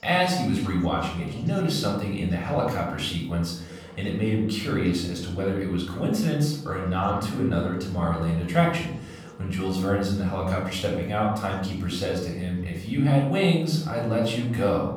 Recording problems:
off-mic speech; far
room echo; noticeable; dies away in 0.8 s
background chatter; faint; throughout; 4 voices, 20 dB below the speech

